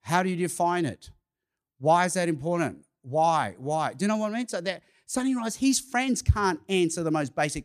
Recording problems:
none

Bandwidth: 14.5 kHz